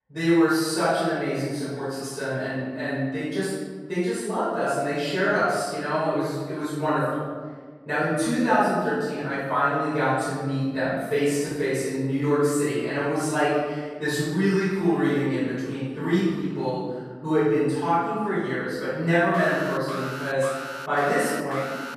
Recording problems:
room echo; strong; dies away in 1.5 s
off-mic speech; far
alarm; noticeable; from 19 s on; peak 9 dB below the speech

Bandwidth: 14 kHz